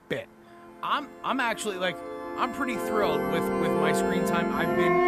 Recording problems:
background music; very loud; throughout; 2 dB above the speech
hiss; faint; throughout; 25 dB below the speech

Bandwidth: 14.5 kHz